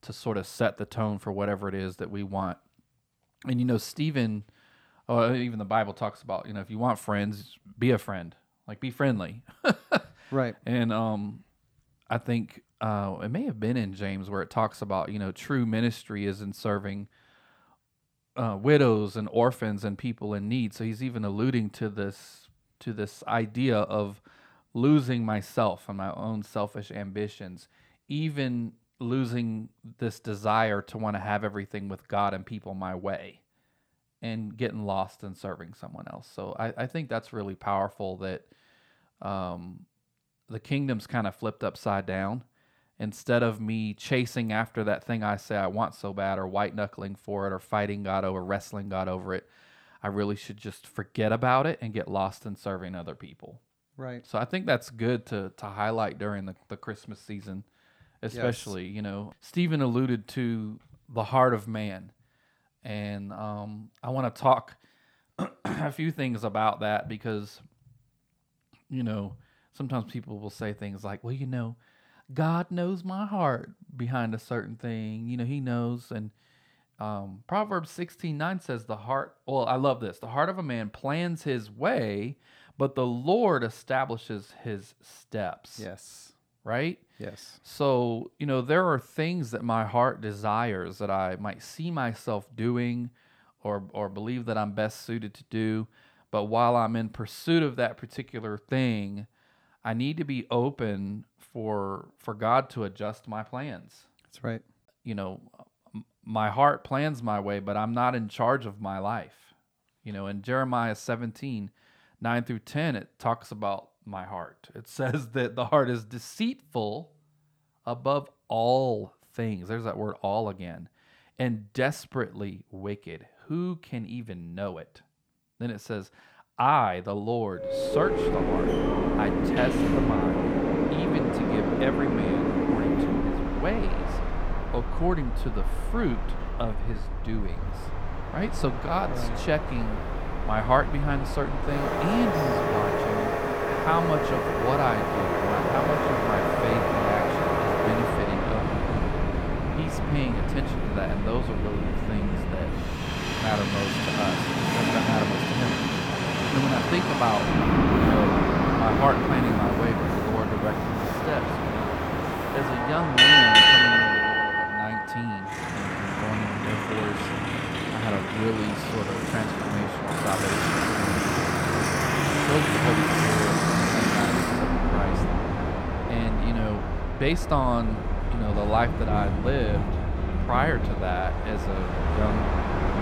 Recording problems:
train or aircraft noise; very loud; from 2:08 on; 5 dB above the speech

